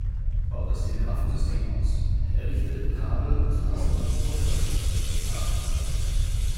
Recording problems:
room echo; strong; dies away in 2.9 s
off-mic speech; far
household noises; very loud; throughout; 2 dB above the speech
low rumble; loud; throughout; 5 dB below the speech
chatter from many people; faint; throughout; 20 dB below the speech
uneven, jittery; slightly; from 1 to 6 s

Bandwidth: 16 kHz